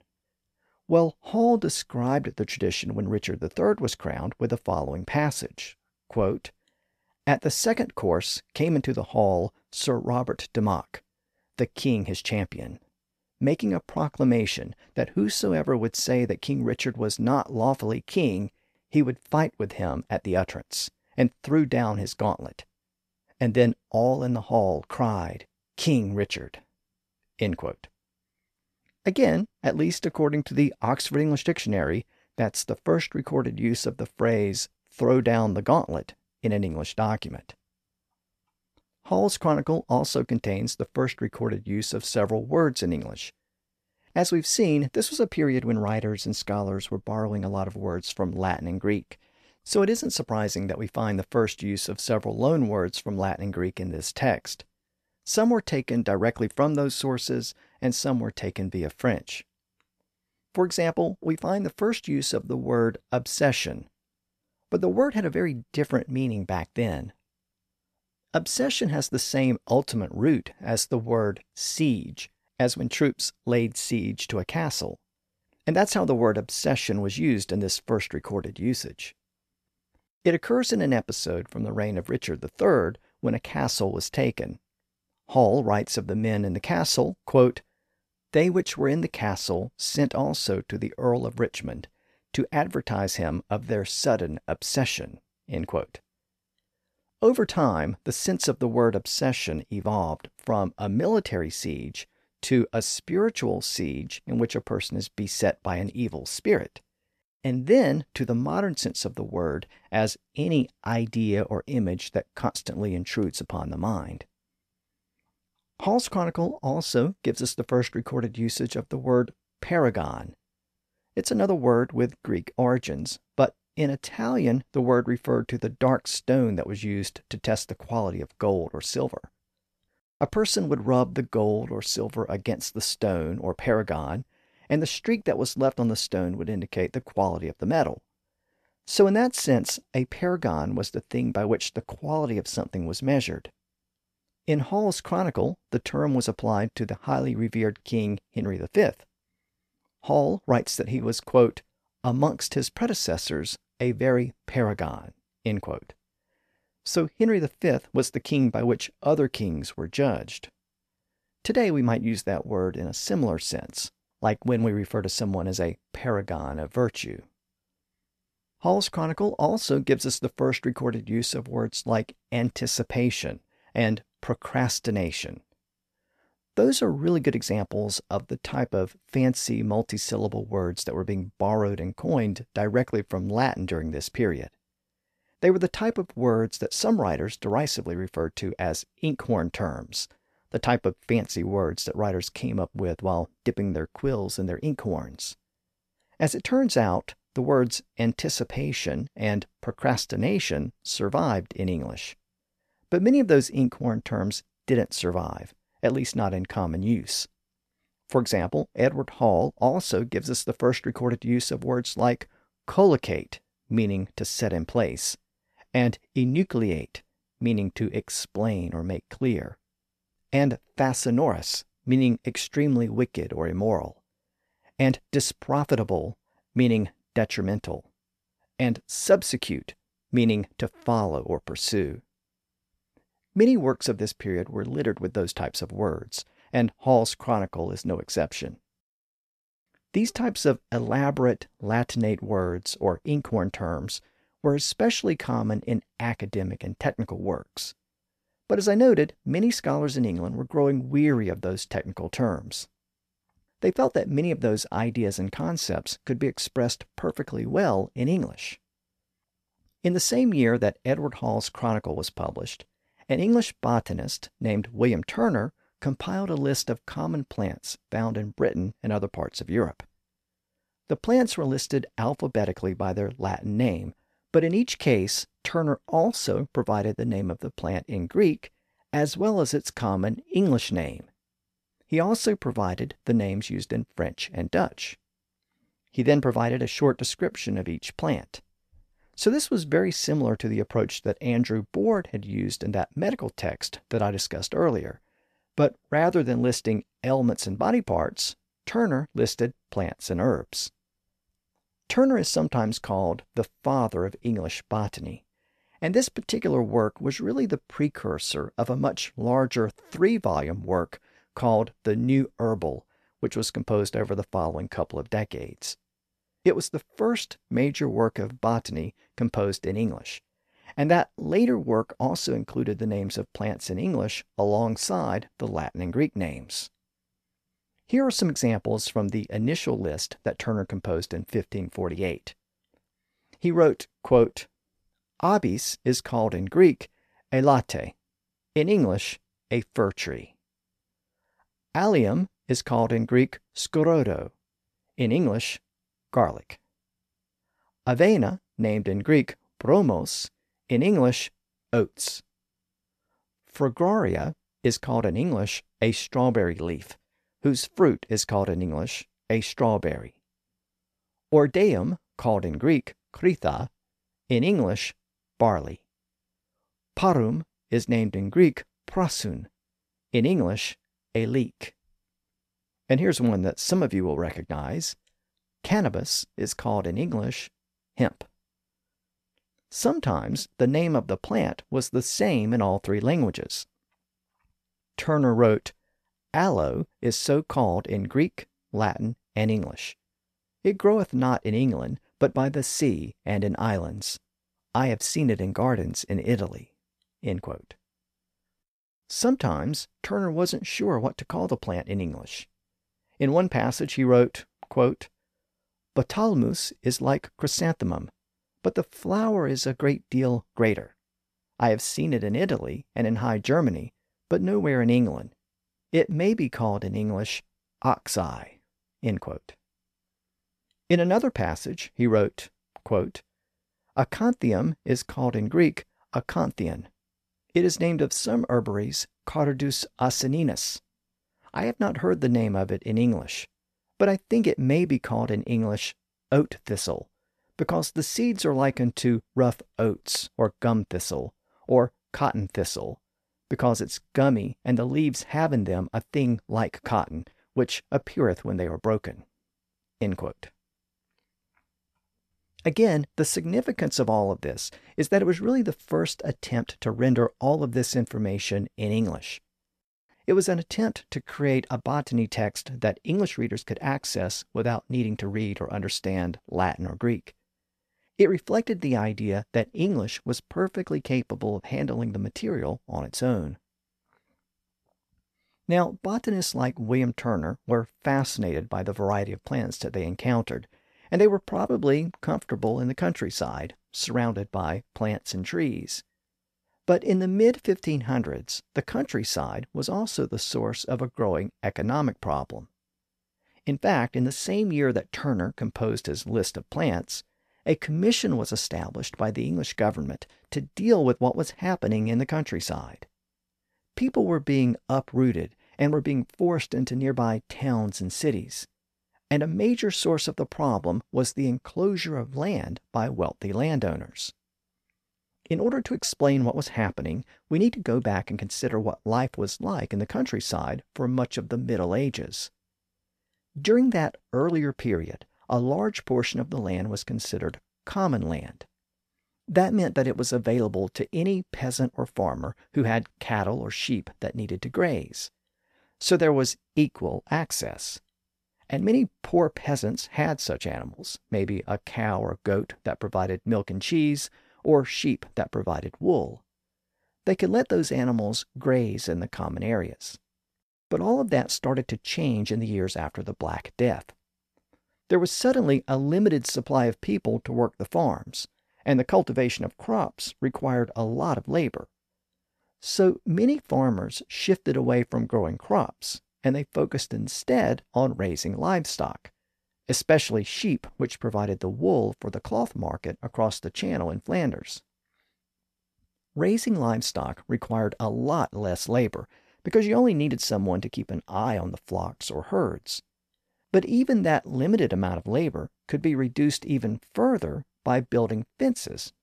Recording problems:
none

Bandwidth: 14 kHz